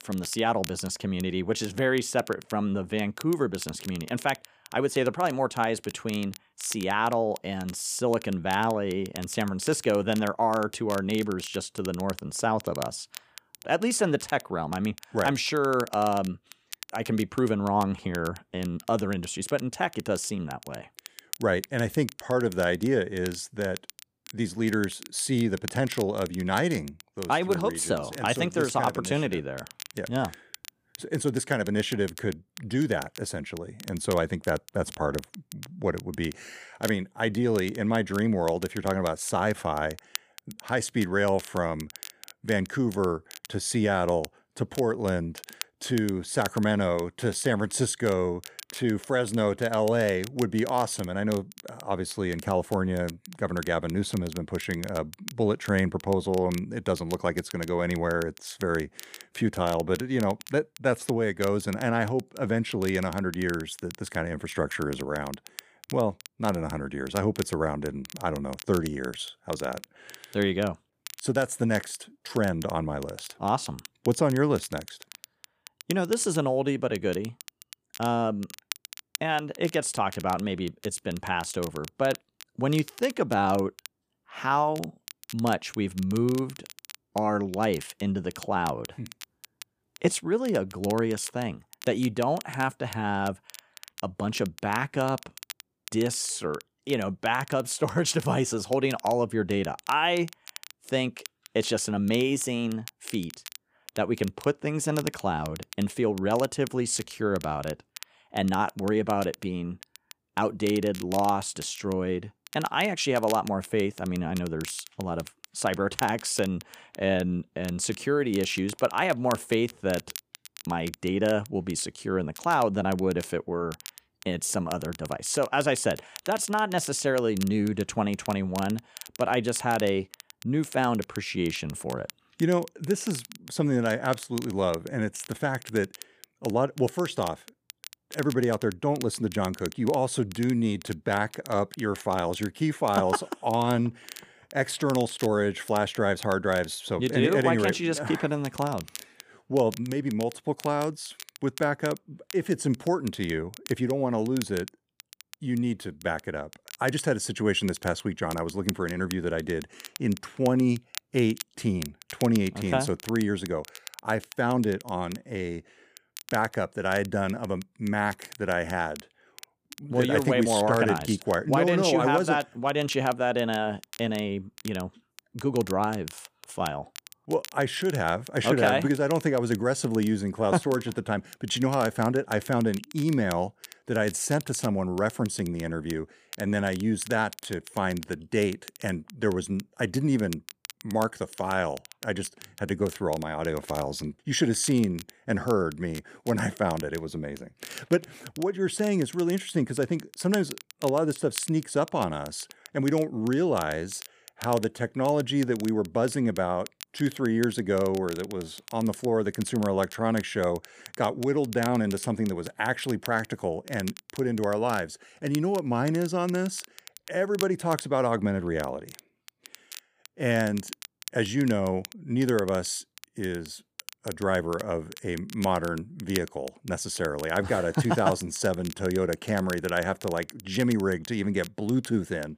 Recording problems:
crackle, like an old record; noticeable; 15 dB below the speech

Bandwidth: 15 kHz